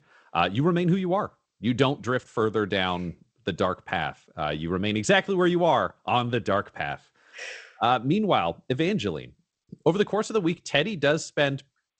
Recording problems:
garbled, watery; slightly; nothing above 8 kHz

